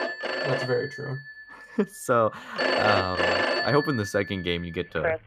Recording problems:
alarms or sirens; very loud; throughout; as loud as the speech

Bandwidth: 14.5 kHz